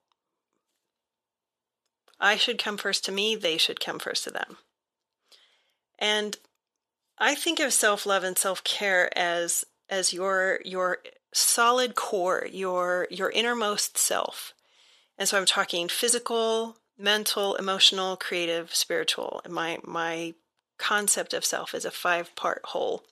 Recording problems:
thin; very; fading below 550 Hz

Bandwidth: 13.5 kHz